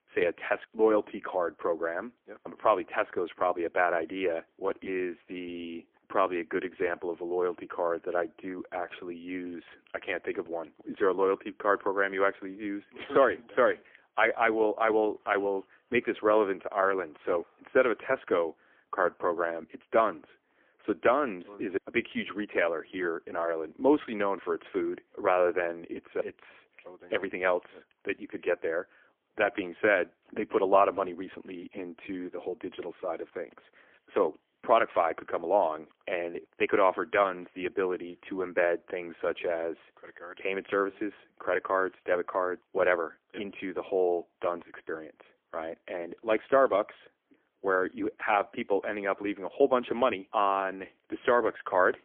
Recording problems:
phone-call audio; poor line; nothing above 3.5 kHz

